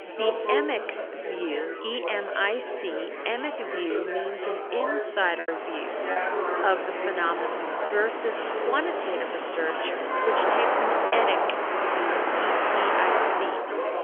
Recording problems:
phone-call audio; nothing above 3.5 kHz
traffic noise; very loud; from 5.5 s on; 3 dB above the speech
chatter from many people; loud; throughout; 1 dB below the speech
choppy; occasionally; 3% of the speech affected

